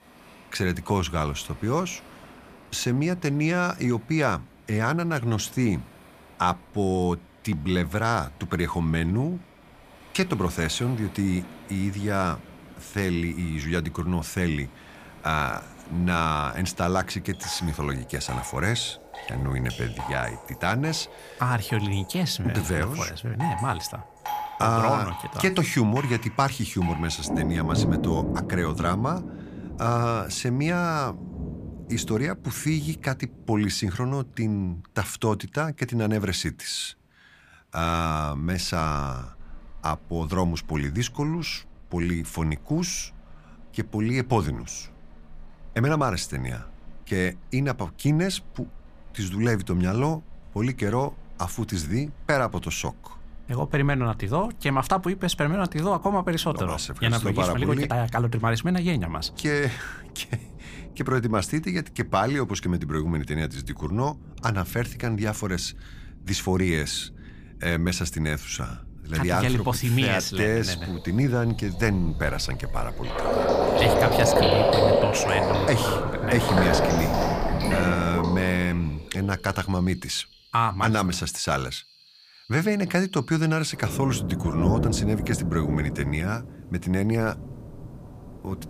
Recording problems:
rain or running water; loud; throughout; 3 dB below the speech

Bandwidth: 15 kHz